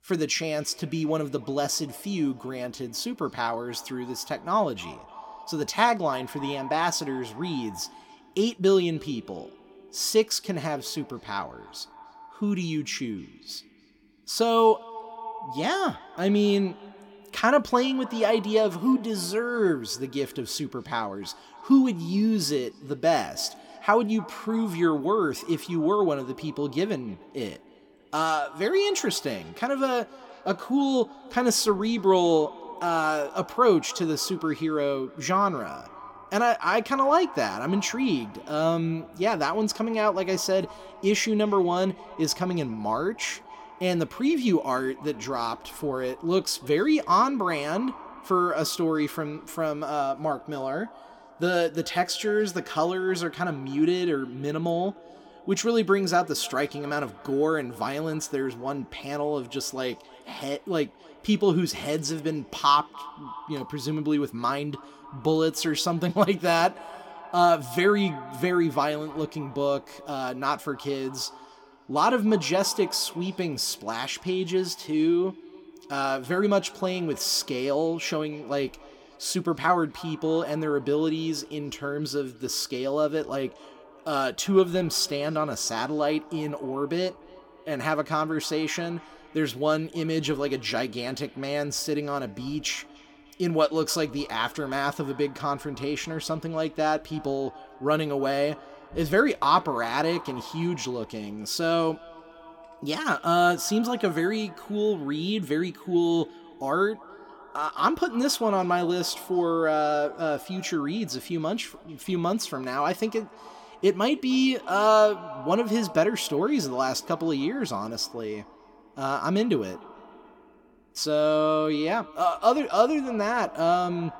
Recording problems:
echo of what is said; faint; throughout; 300 ms later, 20 dB below the speech

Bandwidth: 17.5 kHz